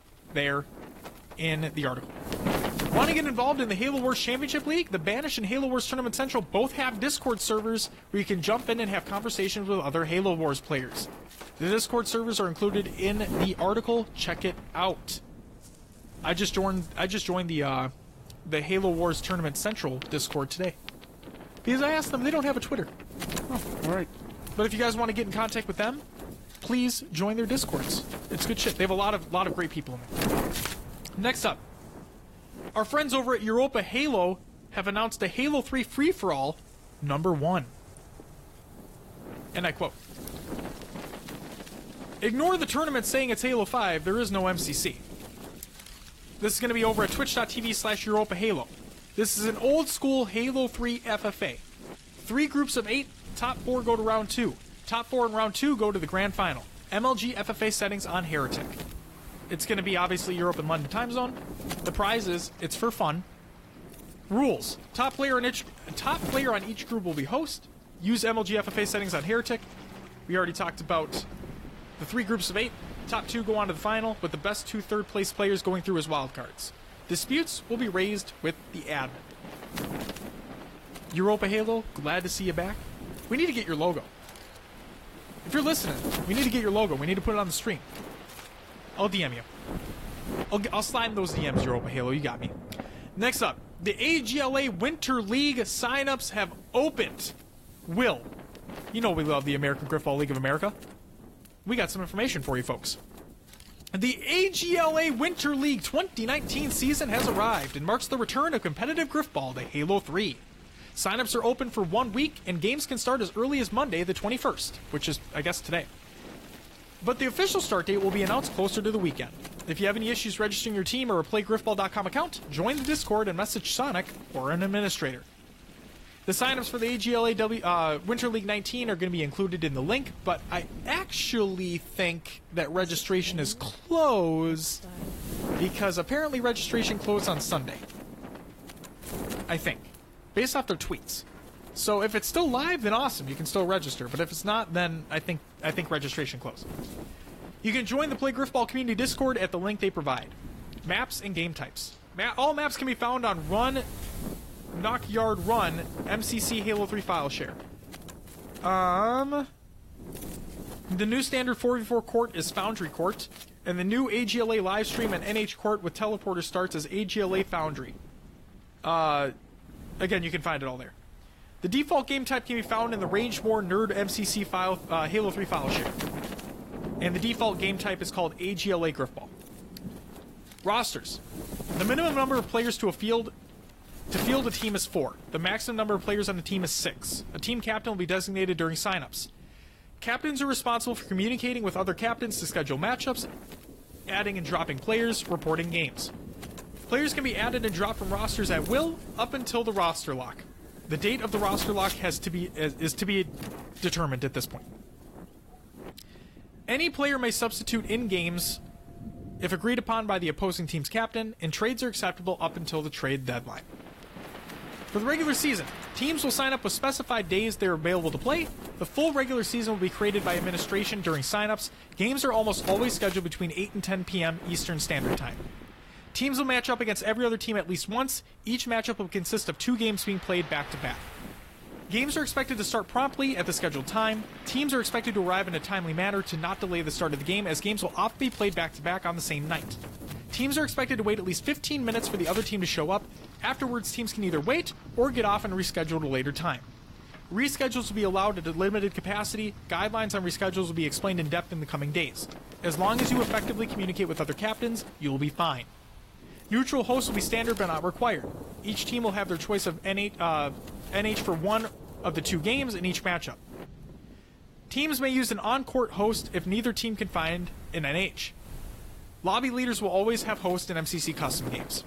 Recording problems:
garbled, watery; slightly
wind noise on the microphone; occasional gusts; 15 dB below the speech
rain or running water; faint; throughout; 20 dB below the speech

